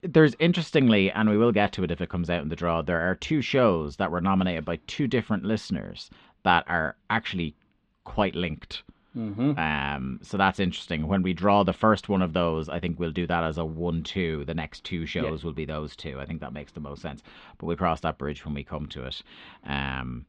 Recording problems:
muffled; slightly; fading above 3.5 kHz

